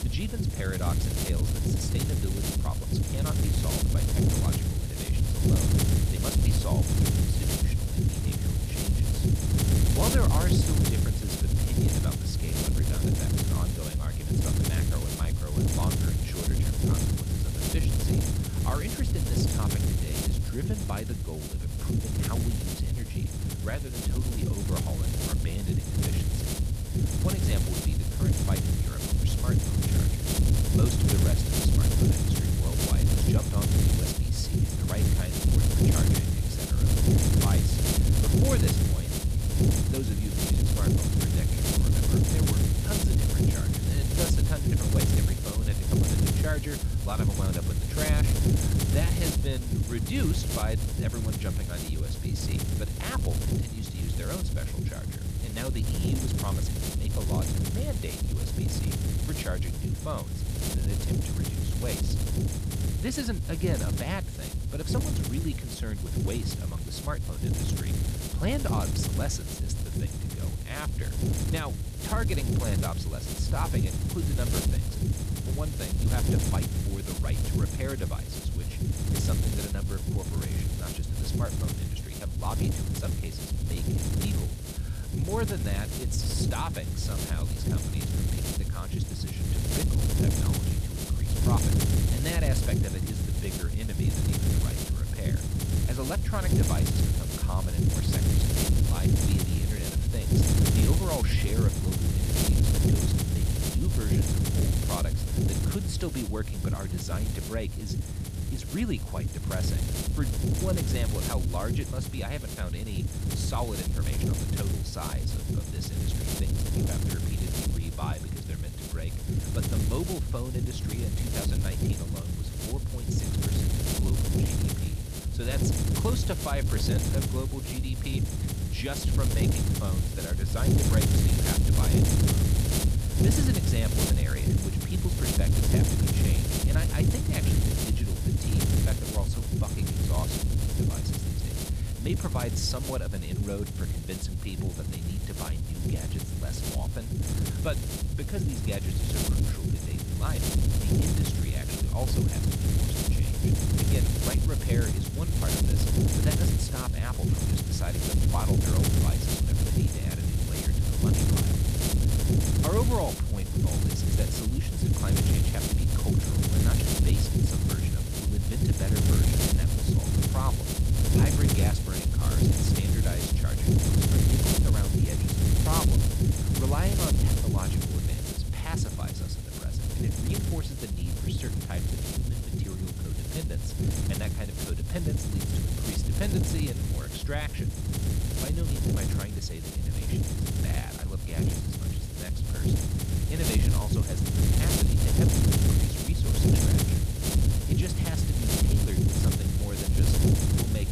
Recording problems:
wind noise on the microphone; heavy; 4 dB above the speech

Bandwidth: 15 kHz